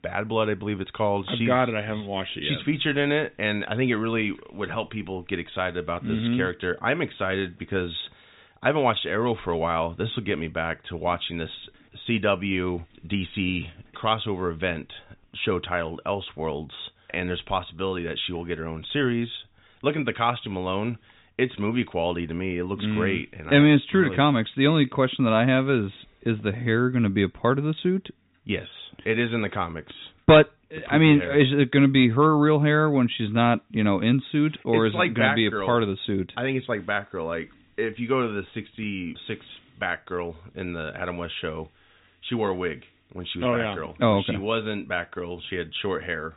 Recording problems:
high frequencies cut off; severe; nothing above 4 kHz

